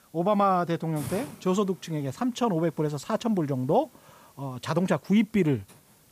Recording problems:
hiss; faint; throughout; 20 dB below the speech

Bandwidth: 15 kHz